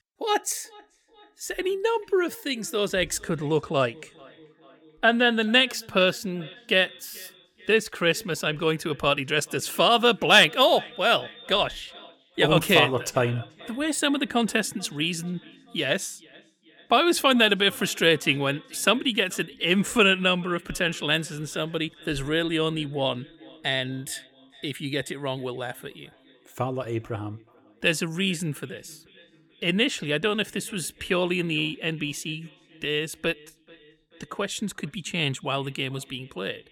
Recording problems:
echo of what is said; faint; throughout; 430 ms later, 25 dB below the speech

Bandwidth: 18.5 kHz